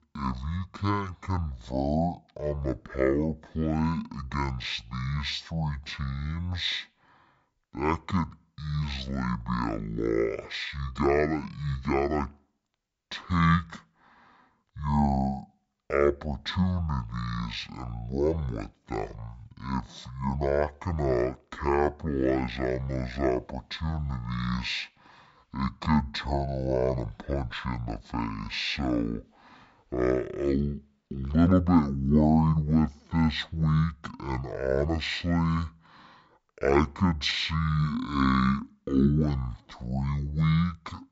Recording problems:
wrong speed and pitch; too slow and too low; 0.5 times normal speed

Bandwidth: 7.5 kHz